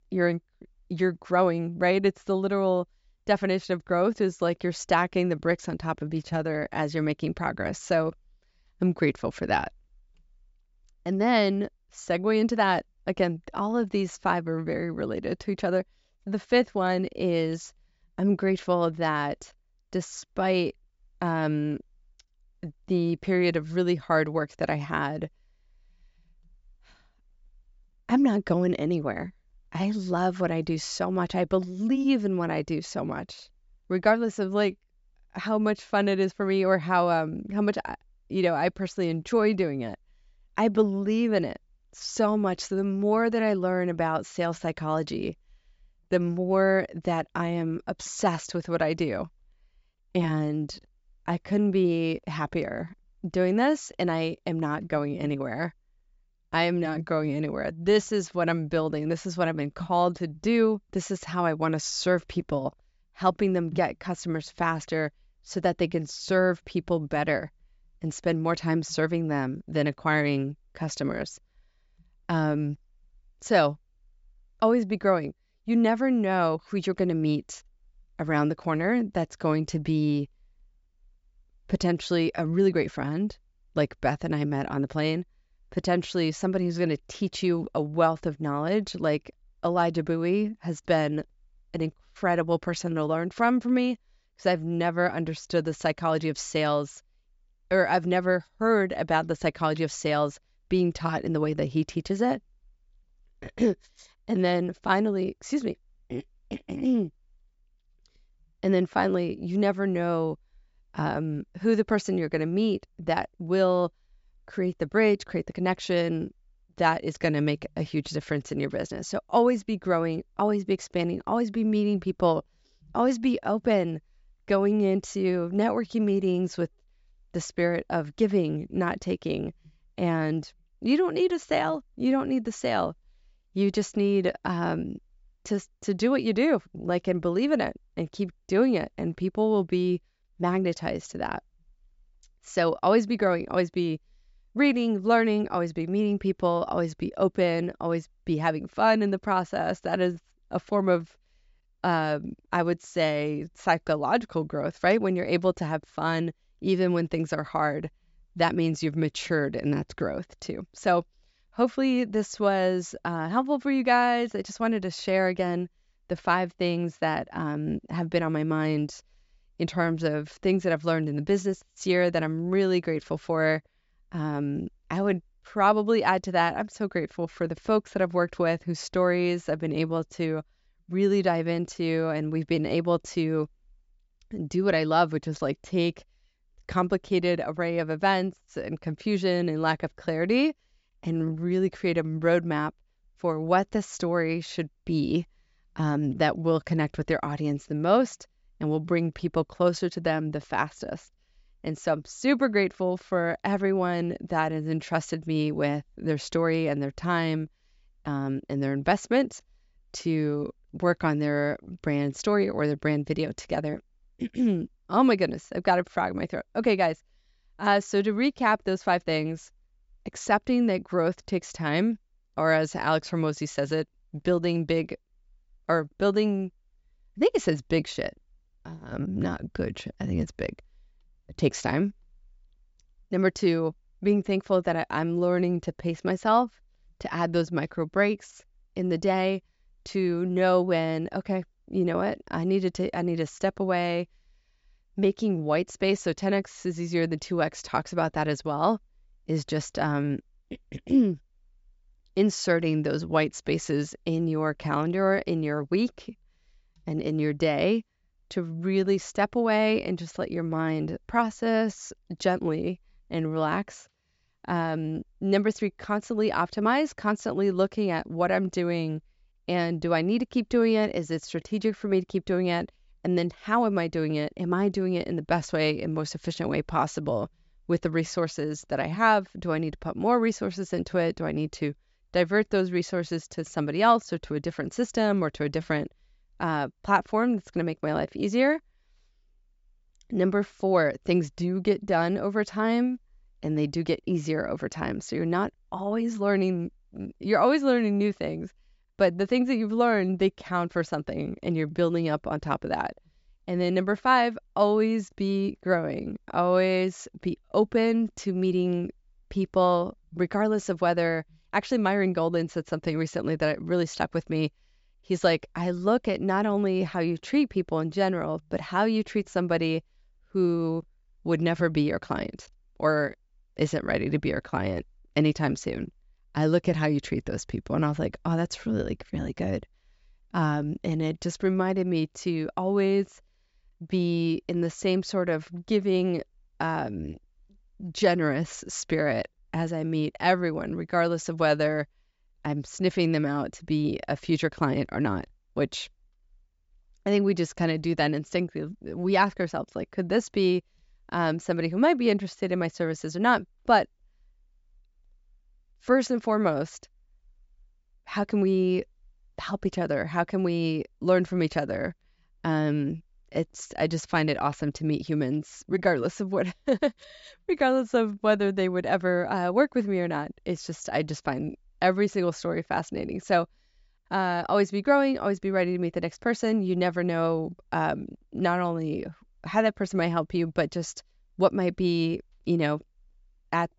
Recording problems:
high frequencies cut off; noticeable; nothing above 8 kHz

